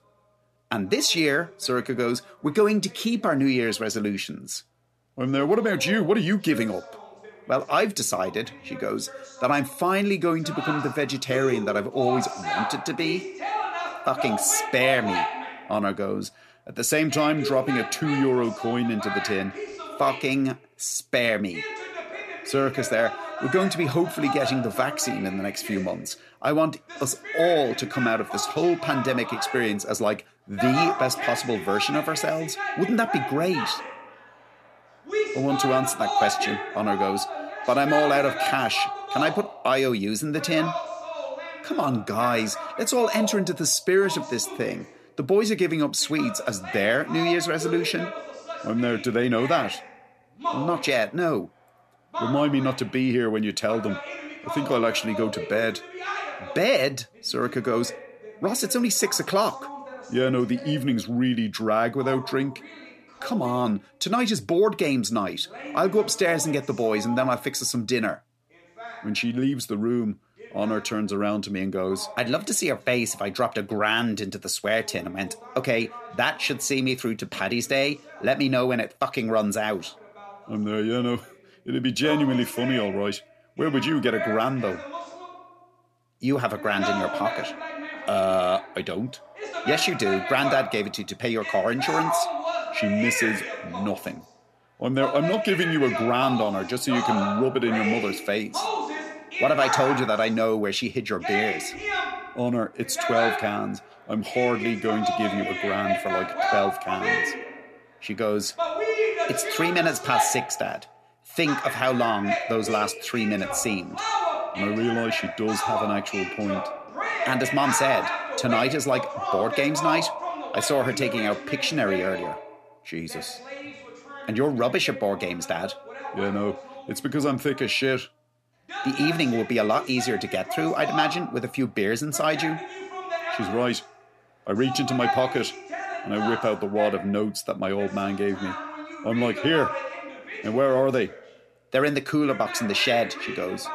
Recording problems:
voice in the background; loud; throughout; 6 dB below the speech

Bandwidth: 14 kHz